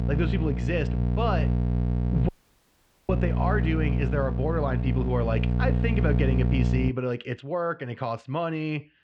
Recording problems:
muffled; very; fading above 3 kHz
electrical hum; loud; until 7 s; 60 Hz, 6 dB below the speech
audio cutting out; at 2.5 s for 1 s

